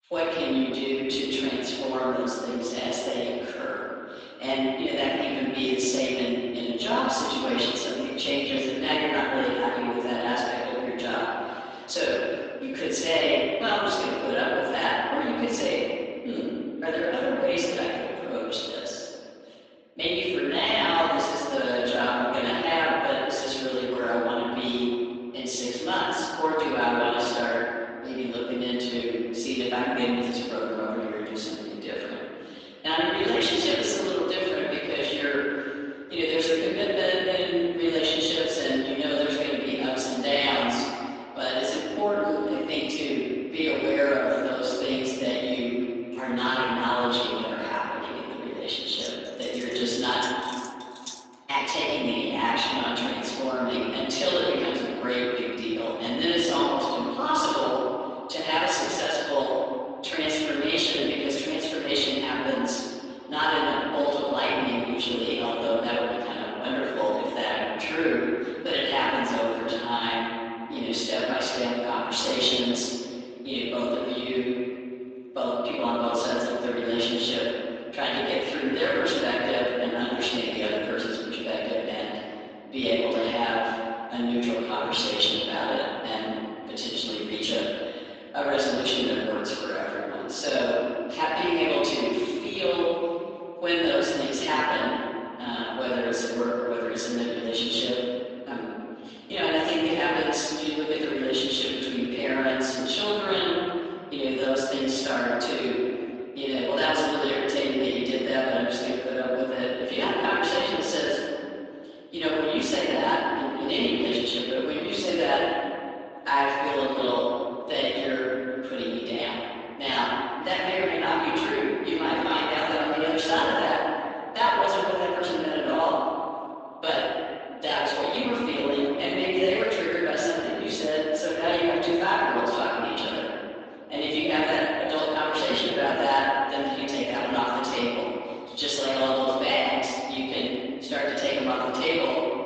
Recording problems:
room echo; strong; dies away in 2.3 s
off-mic speech; far
garbled, watery; slightly; nothing above 7.5 kHz
thin; very slightly; fading below 300 Hz
jangling keys; faint; from 49 to 51 s; peak 10 dB below the speech

